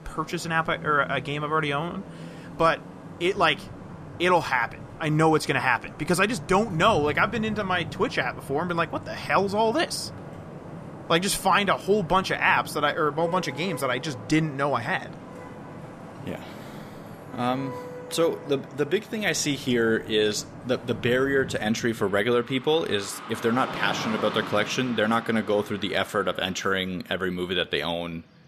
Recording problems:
traffic noise; noticeable; throughout; 15 dB below the speech

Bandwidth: 14.5 kHz